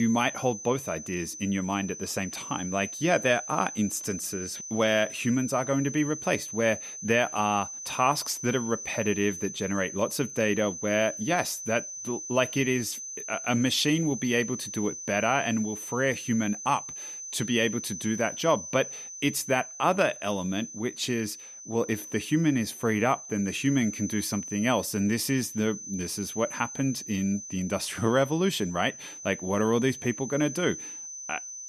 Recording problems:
high-pitched whine; loud; throughout; 6 kHz, 9 dB below the speech
abrupt cut into speech; at the start

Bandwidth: 14.5 kHz